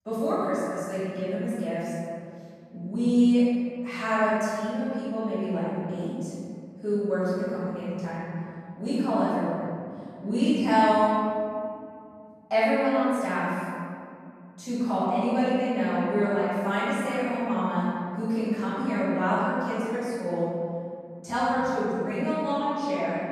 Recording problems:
room echo; strong; dies away in 3 s
off-mic speech; far

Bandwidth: 14 kHz